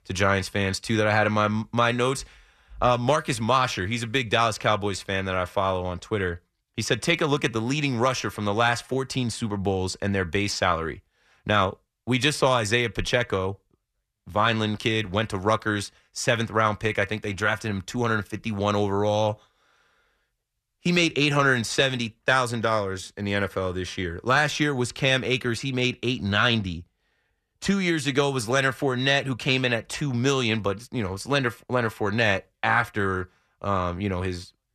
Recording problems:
none

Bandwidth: 14 kHz